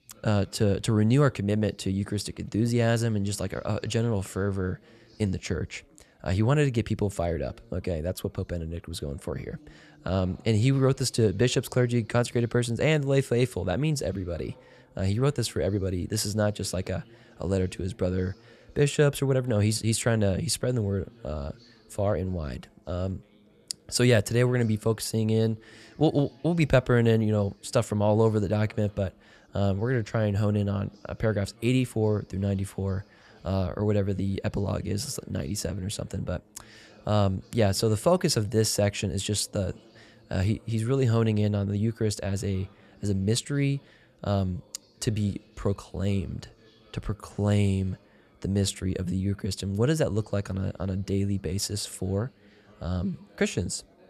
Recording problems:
background chatter; faint; throughout; 4 voices, 30 dB below the speech

